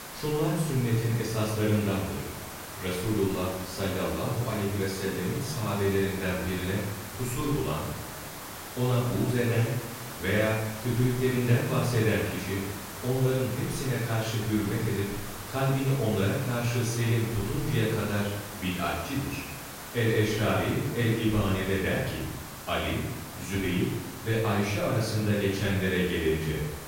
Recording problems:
off-mic speech; far
room echo; noticeable; dies away in 0.9 s
hiss; noticeable; throughout; 10 dB below the speech
voice in the background; faint; throughout; 30 dB below the speech

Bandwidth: 16 kHz